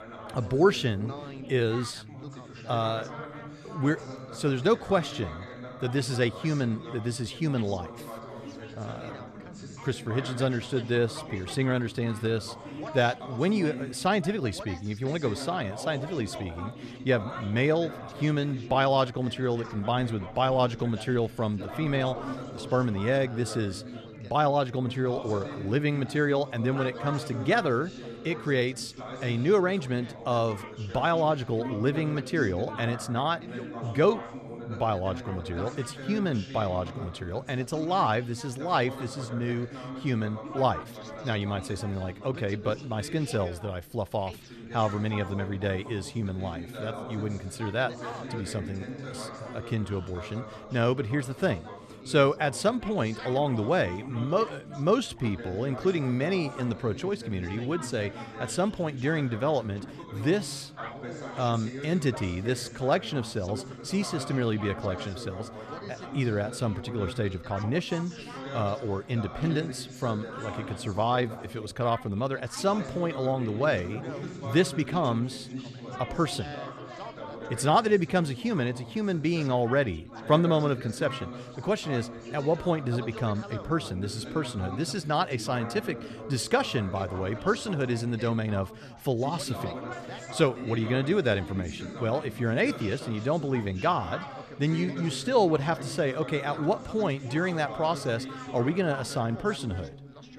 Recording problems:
background chatter; noticeable; throughout; 3 voices, 10 dB below the speech

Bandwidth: 13.5 kHz